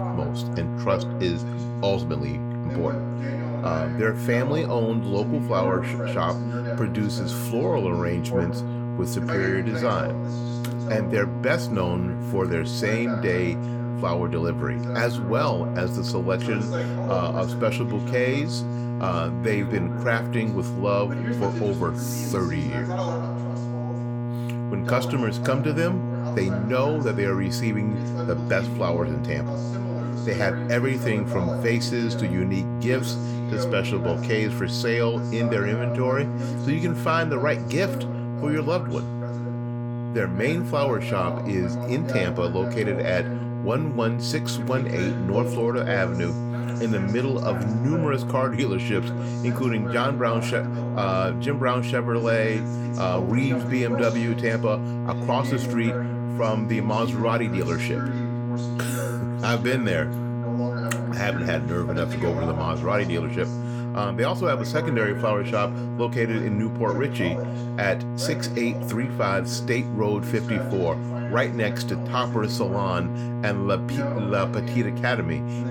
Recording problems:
electrical hum; loud; throughout; 60 Hz, 8 dB below the speech
voice in the background; loud; throughout; 9 dB below the speech

